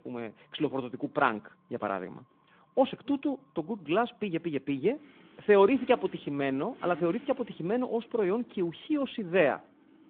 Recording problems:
phone-call audio
traffic noise; faint; throughout; 20 dB below the speech

